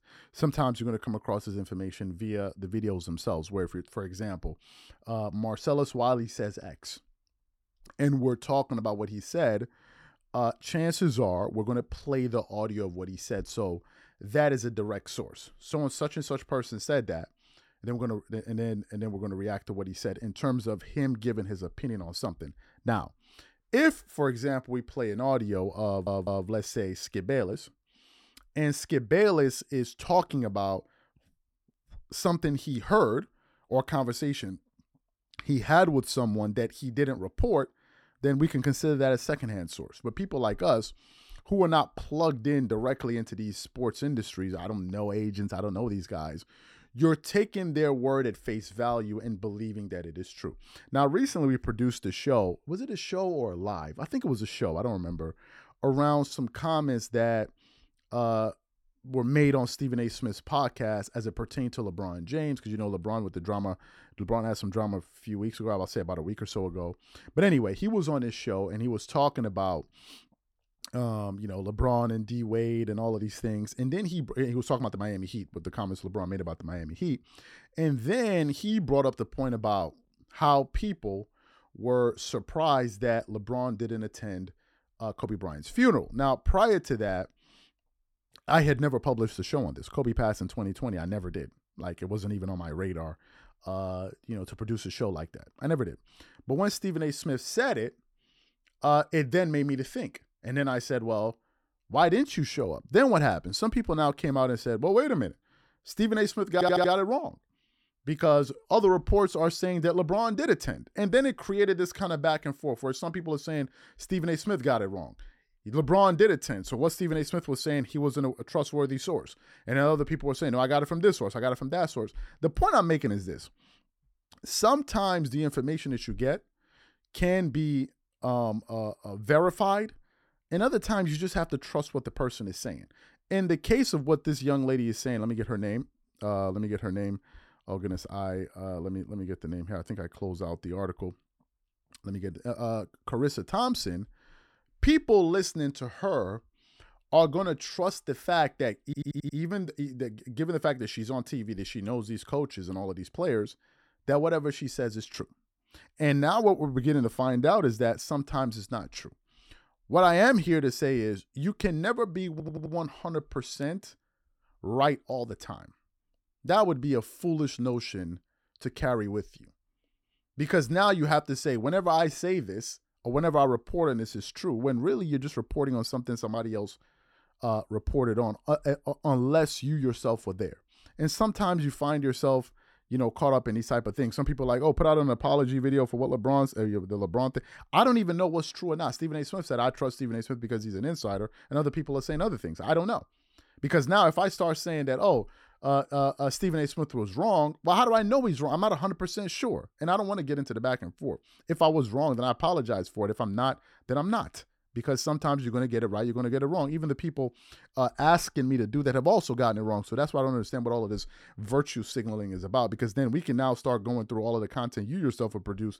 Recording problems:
audio stuttering; 4 times, first at 26 s

